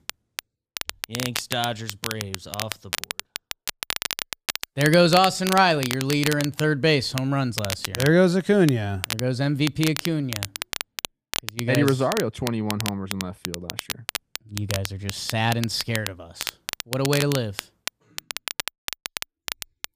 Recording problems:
crackle, like an old record; loud; 8 dB below the speech

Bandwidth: 15 kHz